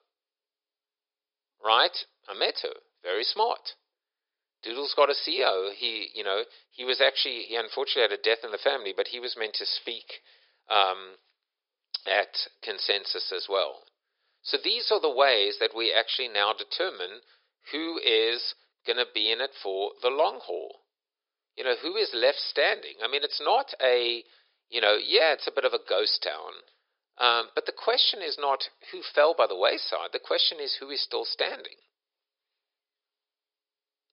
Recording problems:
thin; very; fading below 400 Hz
high frequencies cut off; noticeable; nothing above 5.5 kHz

